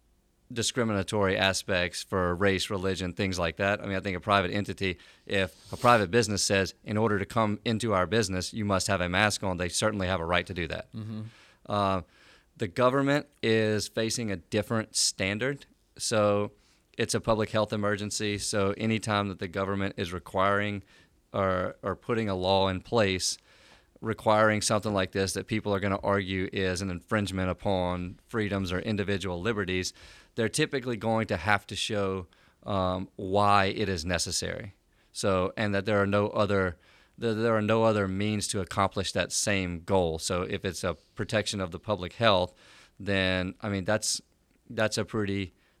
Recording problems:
none

